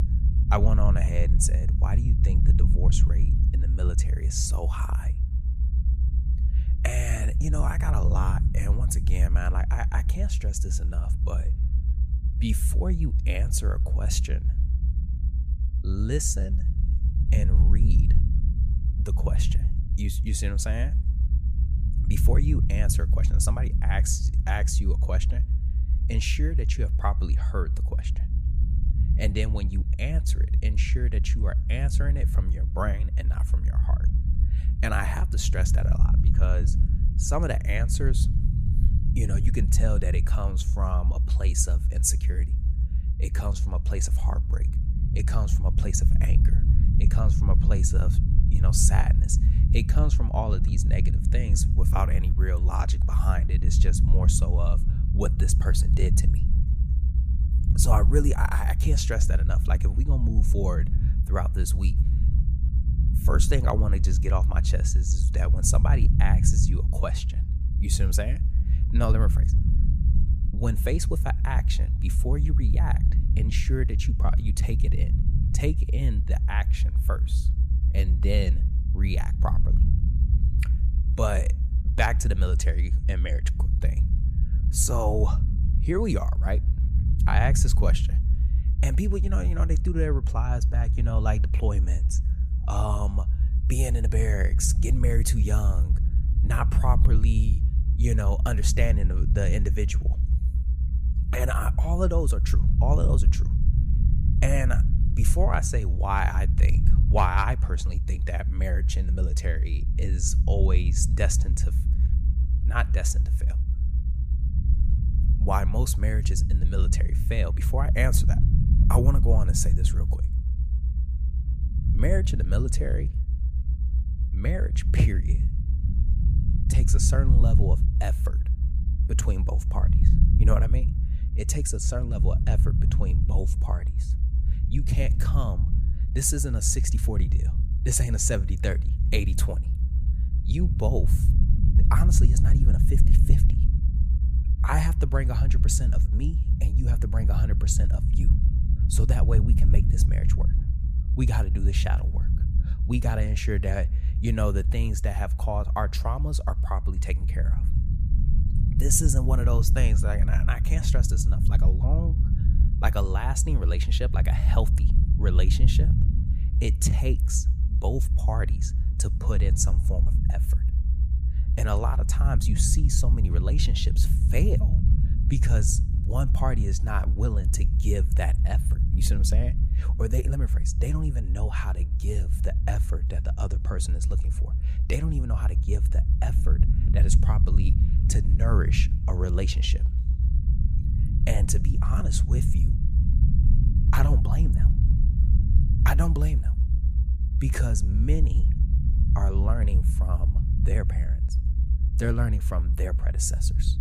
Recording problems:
low rumble; loud; throughout; 8 dB below the speech

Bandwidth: 14.5 kHz